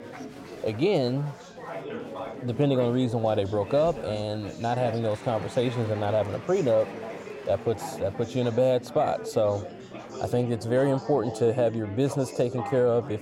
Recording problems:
chatter from many people; noticeable; throughout; 10 dB below the speech

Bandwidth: 16 kHz